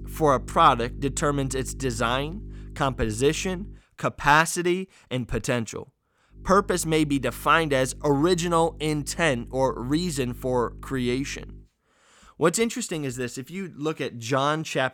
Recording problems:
electrical hum; faint; until 4 s and from 6.5 to 12 s; 50 Hz, 30 dB below the speech

